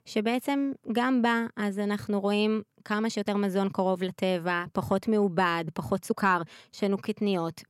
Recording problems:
uneven, jittery; strongly; from 1.5 to 7 s

